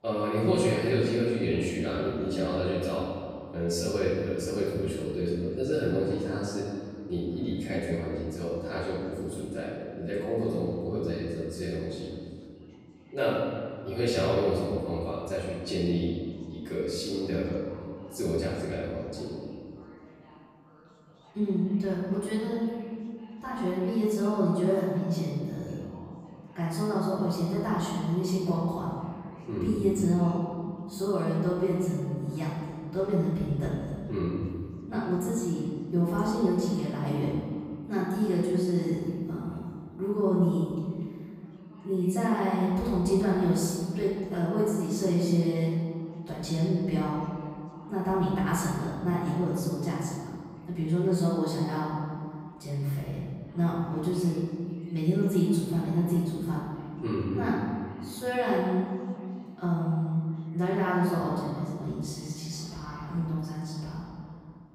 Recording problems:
room echo; strong; dies away in 2 s
off-mic speech; far
chatter from many people; faint; throughout; 25 dB below the speech

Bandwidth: 15.5 kHz